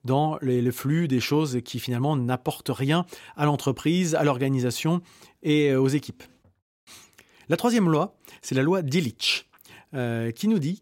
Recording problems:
none

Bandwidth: 16 kHz